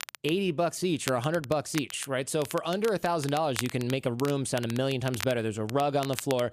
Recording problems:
crackle, like an old record; noticeable; 10 dB below the speech

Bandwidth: 14.5 kHz